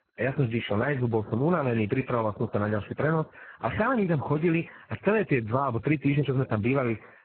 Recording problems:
garbled, watery; badly; nothing above 4 kHz

